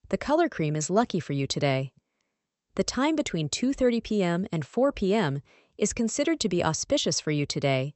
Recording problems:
high frequencies cut off; noticeable; nothing above 8 kHz

